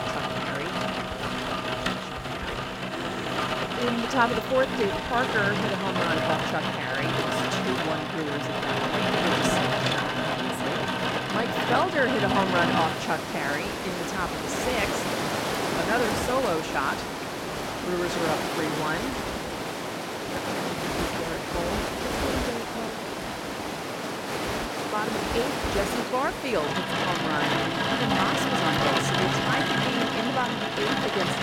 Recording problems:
rain or running water; very loud; throughout; 3 dB above the speech

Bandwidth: 16.5 kHz